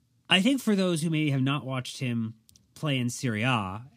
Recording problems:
none

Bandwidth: 15.5 kHz